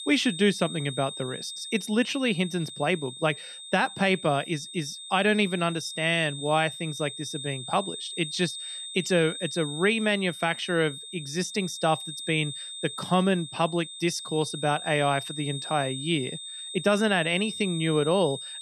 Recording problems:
high-pitched whine; loud; throughout; 3.5 kHz, 9 dB below the speech

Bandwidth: 13.5 kHz